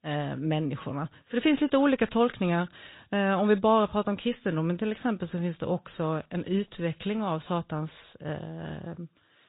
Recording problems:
high frequencies cut off; severe; nothing above 4 kHz
garbled, watery; slightly

